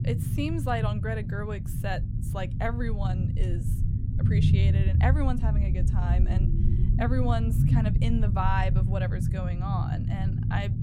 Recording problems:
low rumble; loud; throughout; 5 dB below the speech

